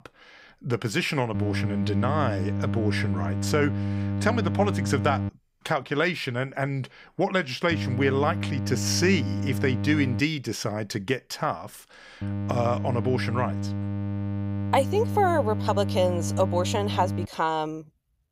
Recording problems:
electrical hum; noticeable; from 1.5 to 5.5 s, from 7.5 to 10 s and from 12 to 17 s; 50 Hz, 10 dB below the speech

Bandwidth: 15.5 kHz